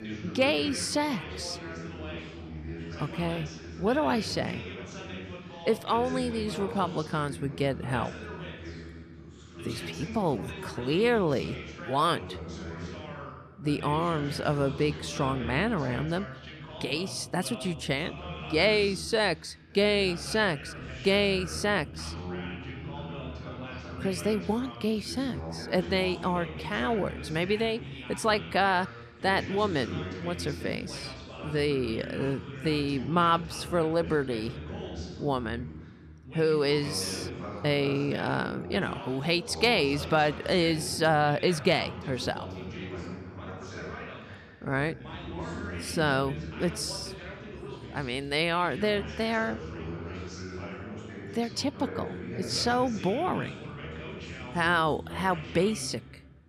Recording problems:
background chatter; noticeable; throughout; 2 voices, 10 dB below the speech

